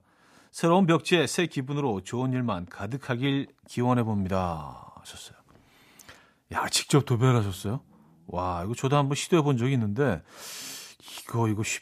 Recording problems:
none

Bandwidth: 14.5 kHz